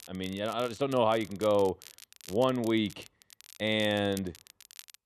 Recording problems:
crackle, like an old record; faint; 20 dB below the speech

